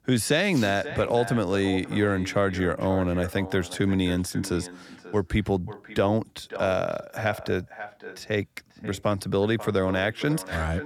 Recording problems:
echo of what is said; noticeable; throughout; 540 ms later, 15 dB below the speech

